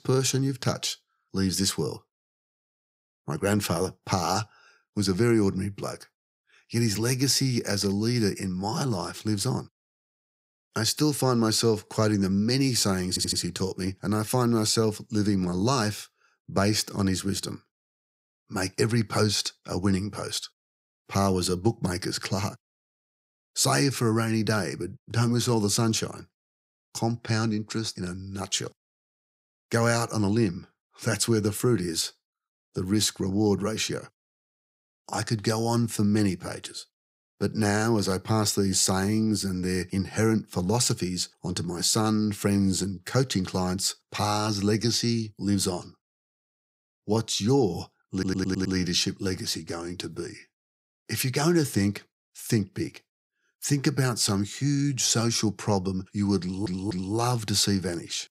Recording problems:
audio stuttering; at 13 s, at 48 s and at 56 s

